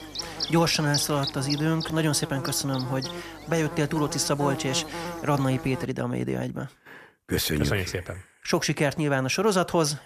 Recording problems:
electrical hum; loud; until 6 s; 50 Hz, 7 dB below the speech

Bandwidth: 14.5 kHz